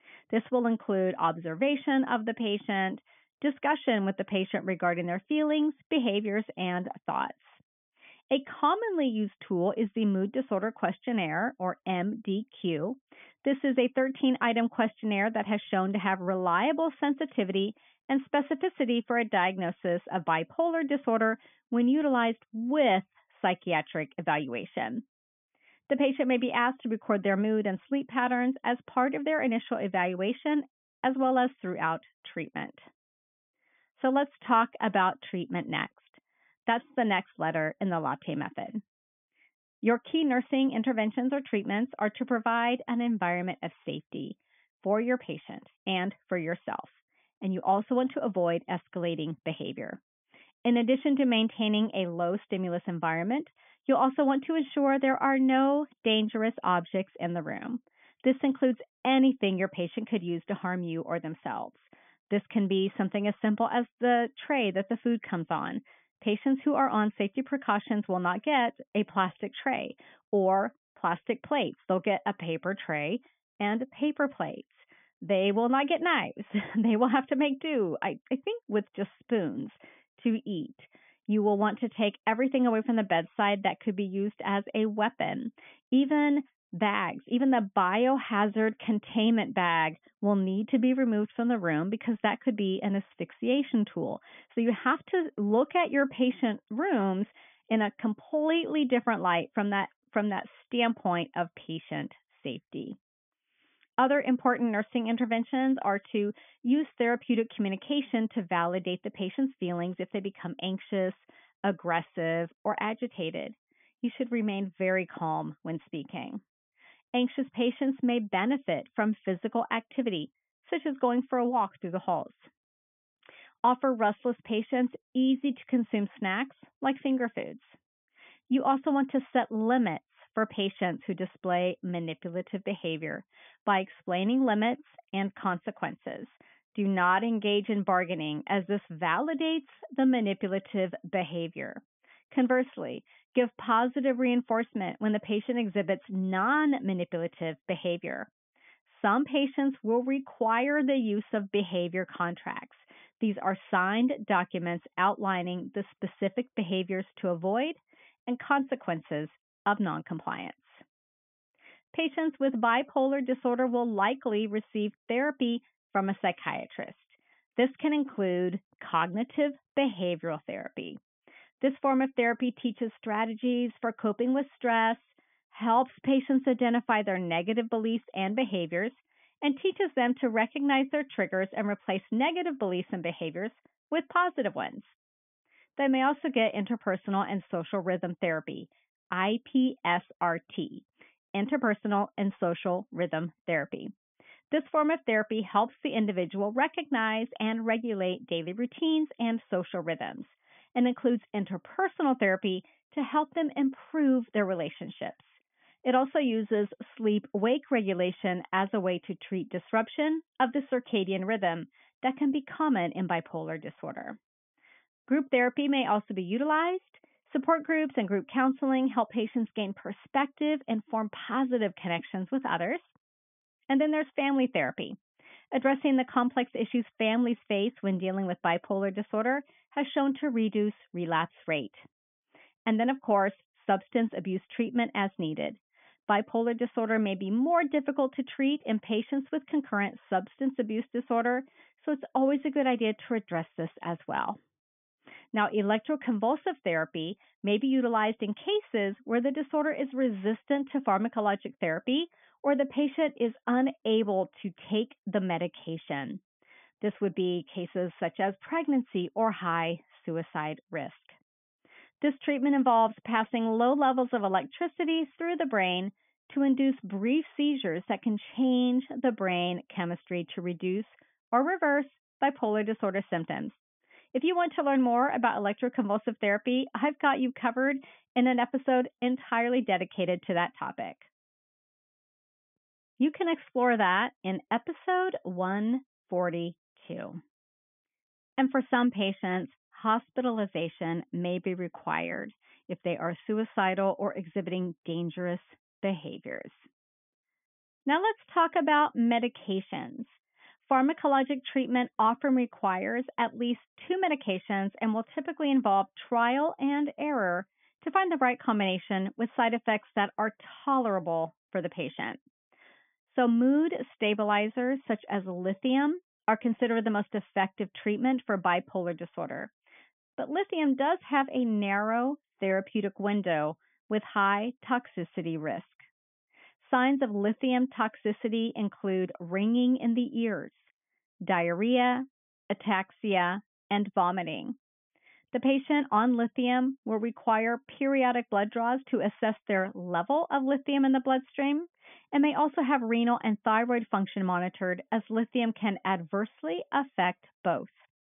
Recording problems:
high frequencies cut off; severe; nothing above 3.5 kHz

